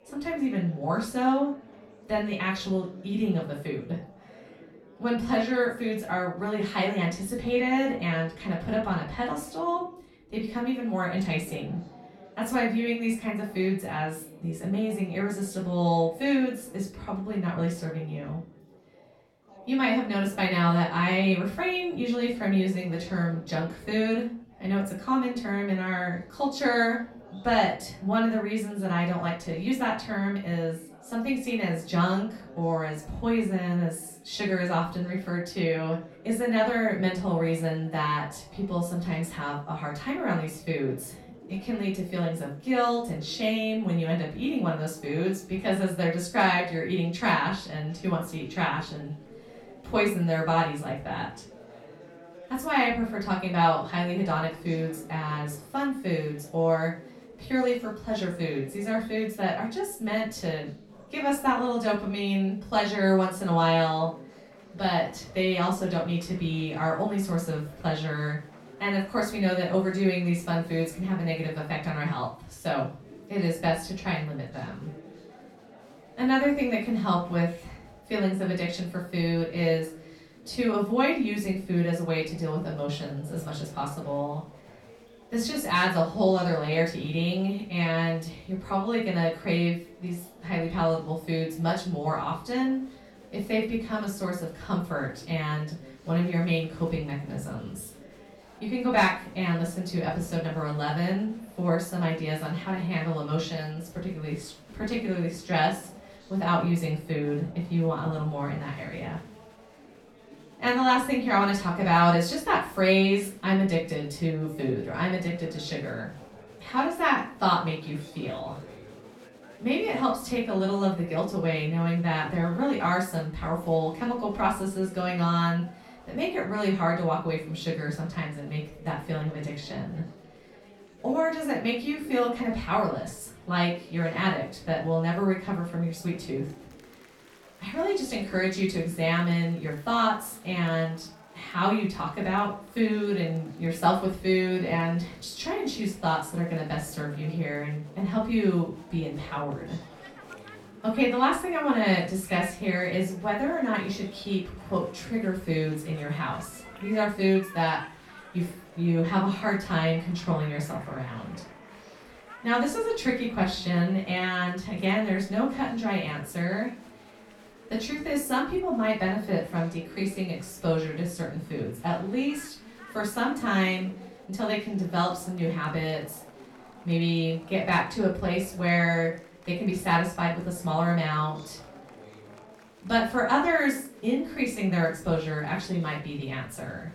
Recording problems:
off-mic speech; far
room echo; slight; dies away in 0.4 s
chatter from many people; faint; throughout; 20 dB below the speech

